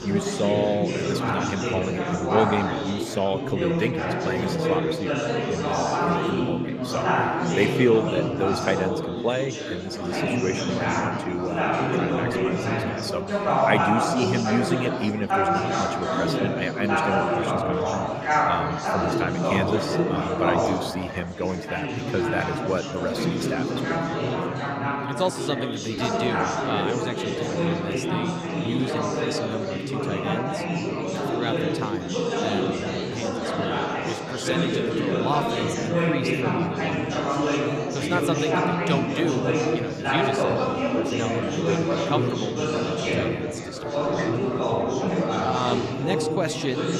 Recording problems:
chatter from many people; very loud; throughout; 4 dB above the speech

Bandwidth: 15 kHz